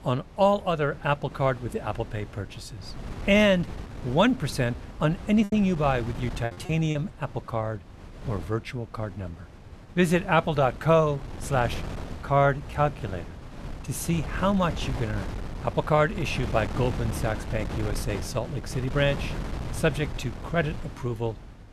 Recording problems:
wind noise on the microphone; occasional gusts; 15 dB below the speech
choppy; very; from 4.5 to 7 s; 10% of the speech affected

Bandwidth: 13.5 kHz